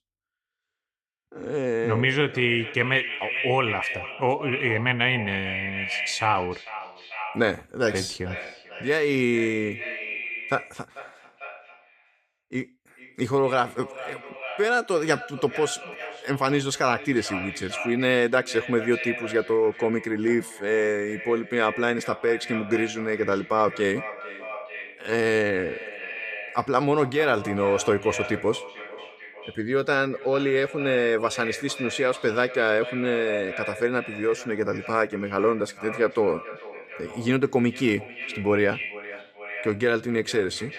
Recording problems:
echo of what is said; strong; throughout; 440 ms later, 10 dB below the speech

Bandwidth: 14.5 kHz